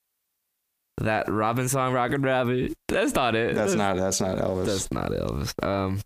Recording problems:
squashed, flat; heavily

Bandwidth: 15 kHz